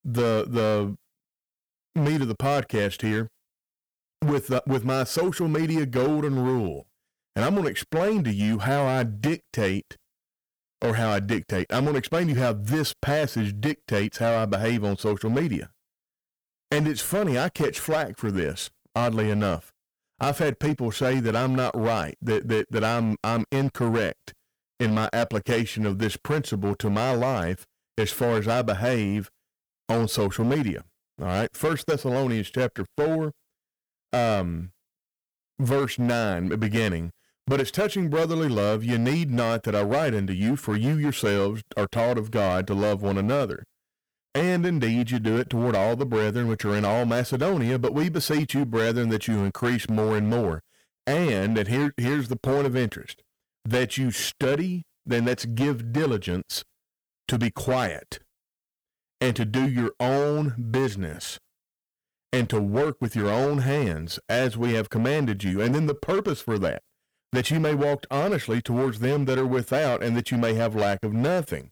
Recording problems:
distortion; slight; 13% of the sound clipped

